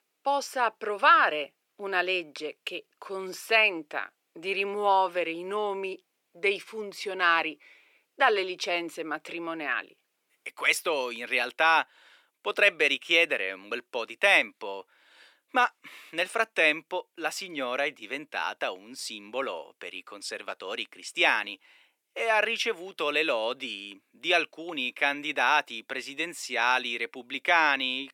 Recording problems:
thin; very; fading below 400 Hz

